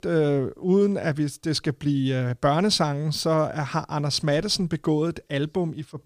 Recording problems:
none

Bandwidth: 15 kHz